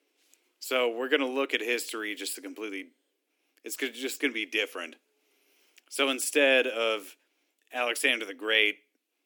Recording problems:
thin; somewhat; fading below 300 Hz

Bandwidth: 18.5 kHz